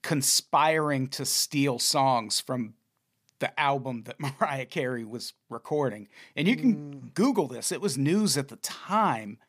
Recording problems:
none

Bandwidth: 15 kHz